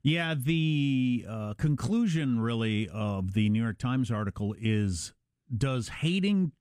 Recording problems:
none

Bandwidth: 15.5 kHz